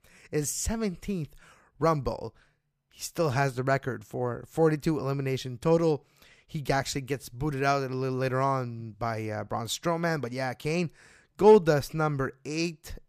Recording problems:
none

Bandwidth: 15 kHz